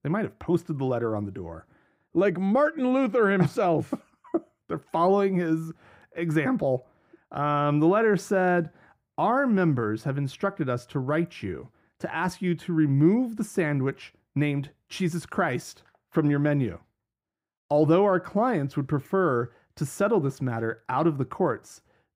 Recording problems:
muffled; slightly; fading above 2.5 kHz

